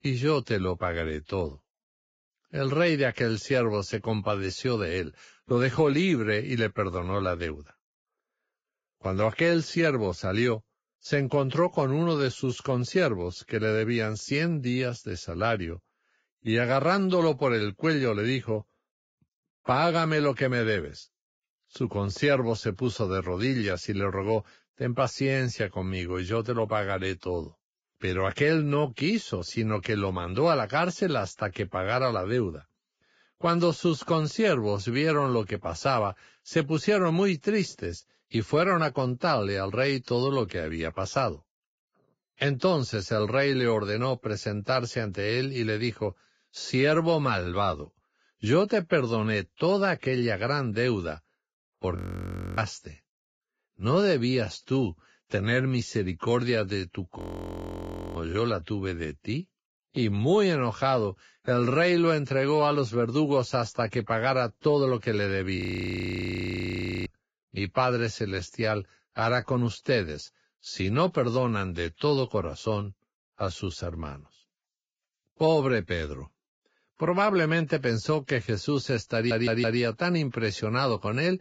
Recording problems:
garbled, watery; badly; nothing above 7.5 kHz
audio freezing; at 52 s for 0.5 s, at 57 s for 1 s and at 1:06 for 1.5 s
audio stuttering; at 1:19

